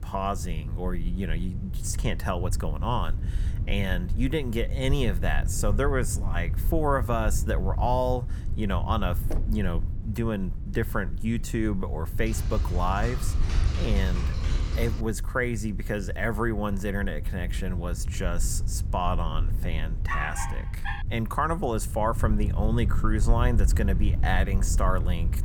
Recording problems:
low rumble; noticeable; throughout; 15 dB below the speech
door banging; noticeable; at 9.5 s; peak 9 dB below the speech
keyboard typing; loud; from 12 to 15 s; peak 2 dB above the speech
dog barking; noticeable; at 20 s; peak 3 dB below the speech

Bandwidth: 18.5 kHz